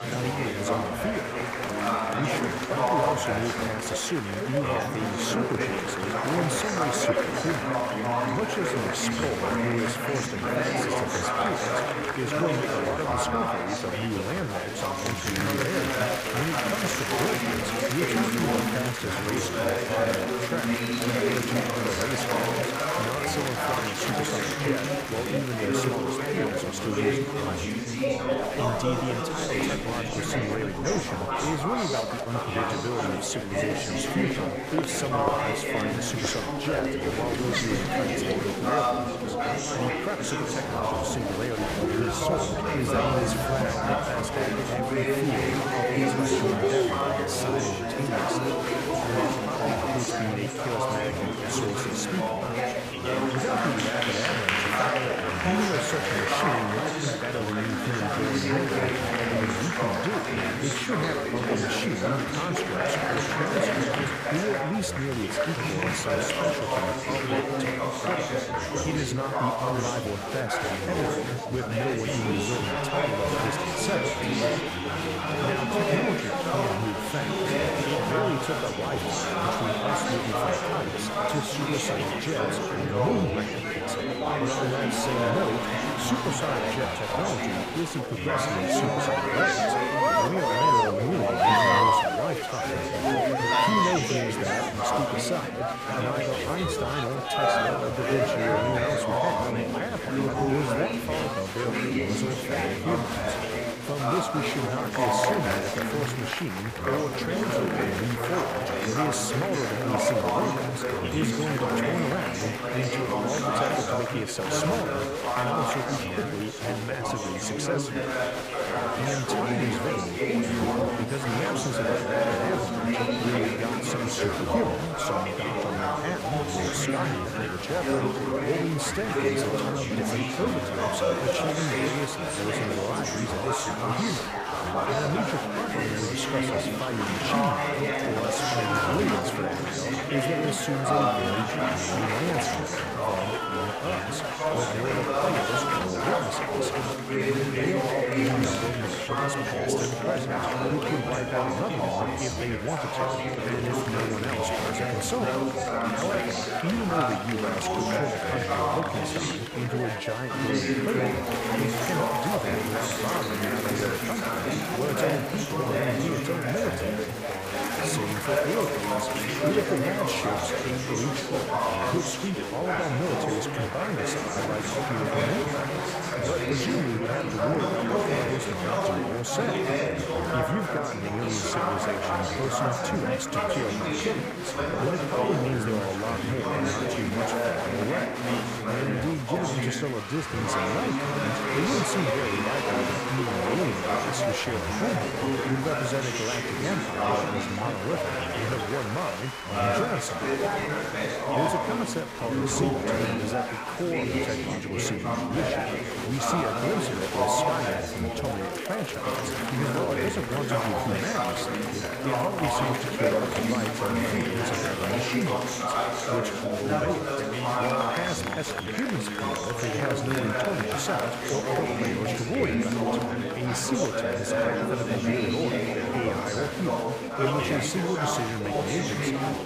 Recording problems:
chatter from many people; very loud; throughout; 5 dB above the speech

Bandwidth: 15 kHz